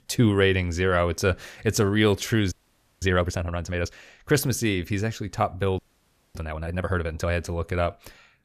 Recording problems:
audio freezing; at 2.5 s for 0.5 s and at 6 s for 0.5 s

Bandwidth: 14.5 kHz